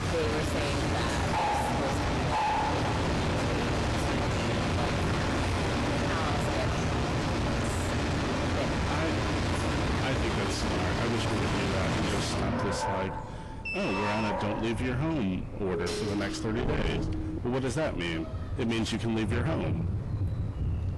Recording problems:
distortion; heavy; 6 dB below the speech
garbled, watery; slightly; nothing above 11.5 kHz
animal sounds; very loud; throughout; 3 dB above the speech
wind noise on the microphone; occasional gusts; 15 dB below the speech
door banging; noticeable; from 7 to 10 s; peak 7 dB below the speech
alarm; noticeable; at 14 s; peak level with the speech
siren; noticeable; from 16 to 17 s; peak 2 dB below the speech

